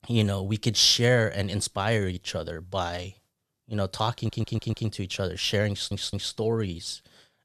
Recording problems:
audio stuttering; at 4 s and at 5.5 s

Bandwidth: 13.5 kHz